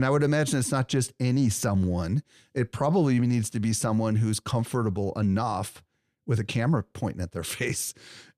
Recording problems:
abrupt cut into speech; at the start

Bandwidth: 14 kHz